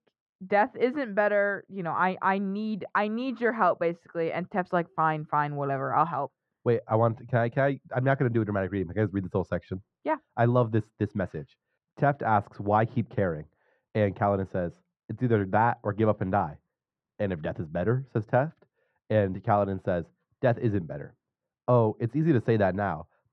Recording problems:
muffled; very; fading above 1 kHz

